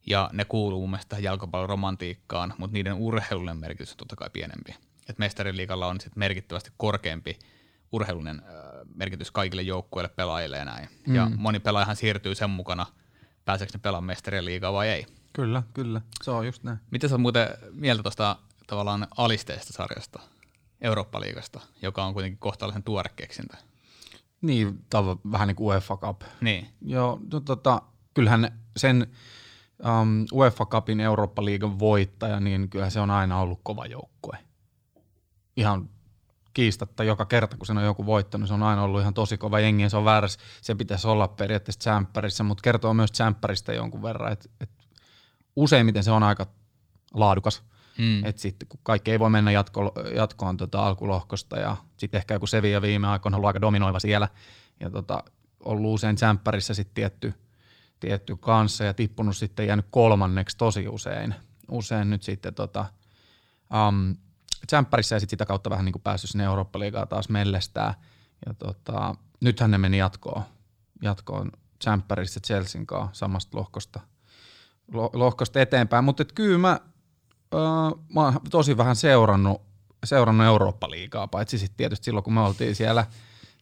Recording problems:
uneven, jittery; strongly; from 3 s to 1:22

